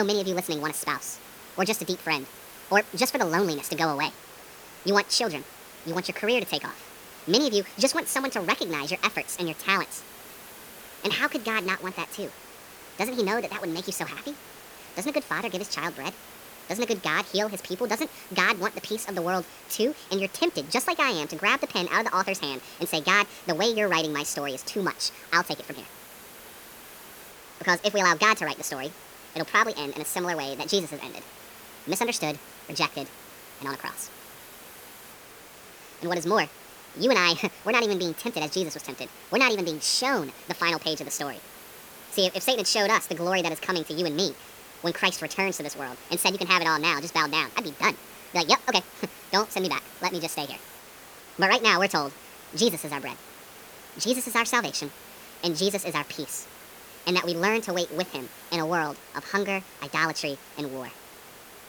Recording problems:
wrong speed and pitch; too fast and too high; 1.6 times normal speed
hiss; noticeable; throughout; 20 dB below the speech
abrupt cut into speech; at the start

